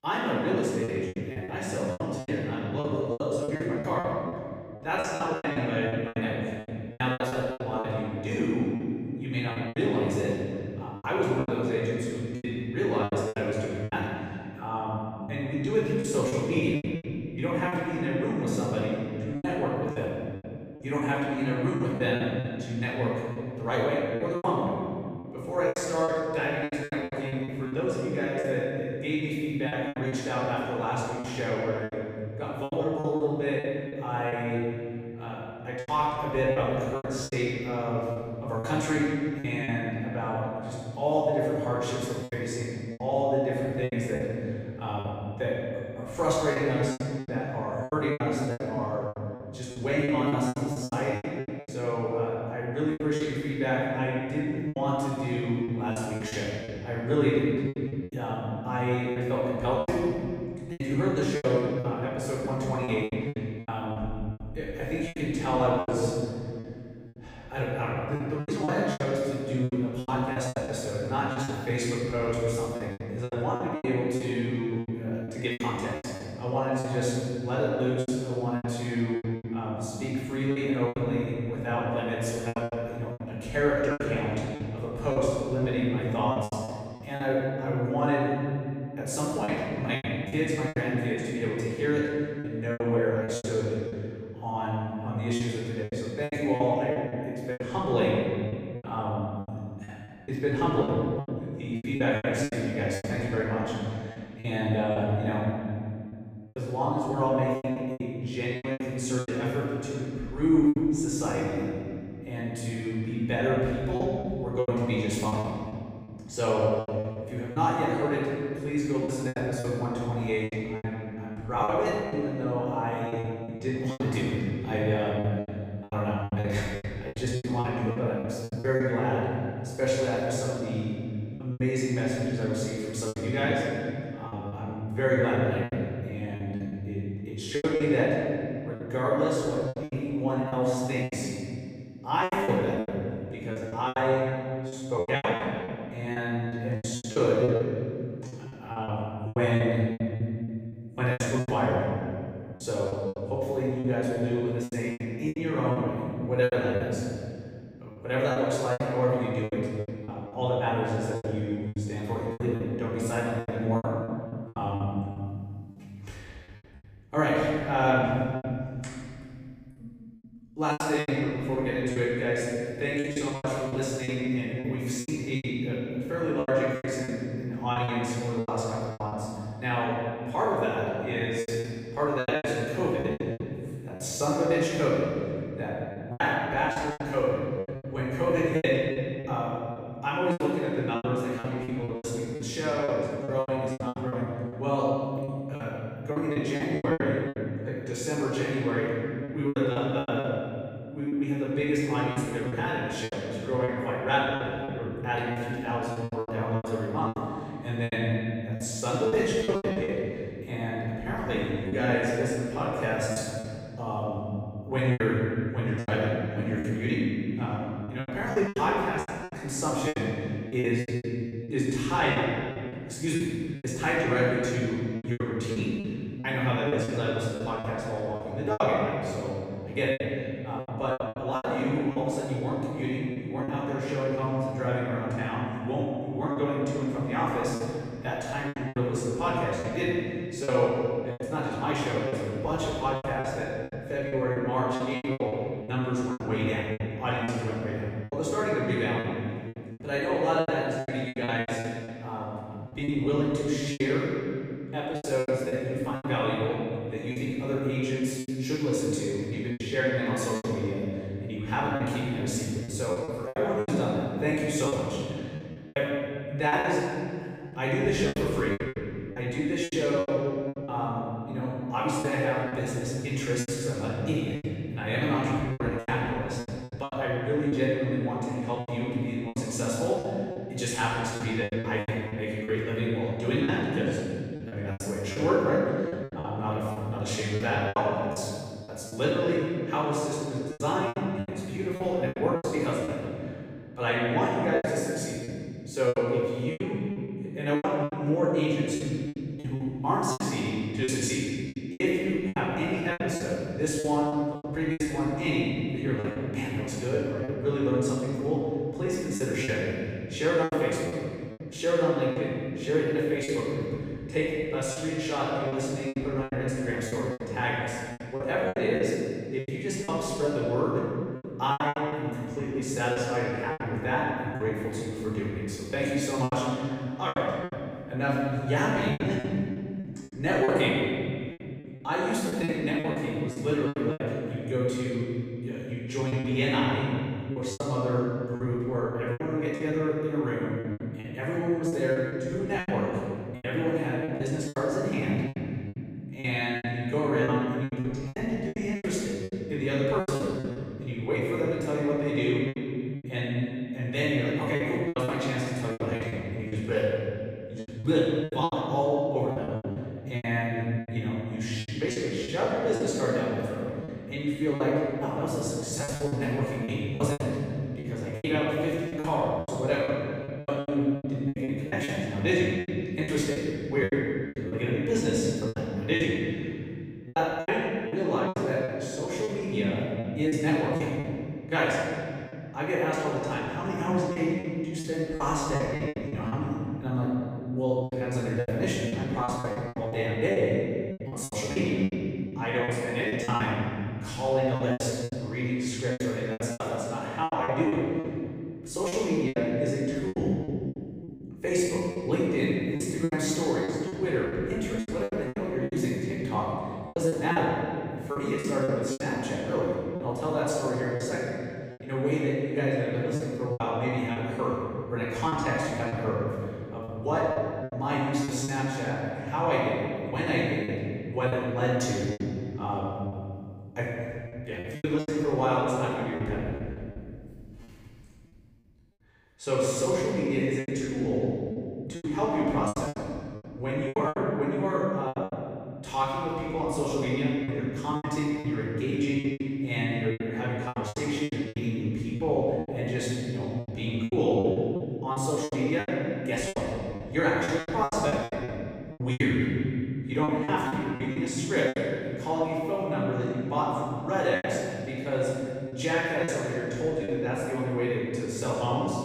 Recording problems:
room echo; strong; dies away in 2.7 s
off-mic speech; far
choppy; very; 11% of the speech affected

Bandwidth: 15.5 kHz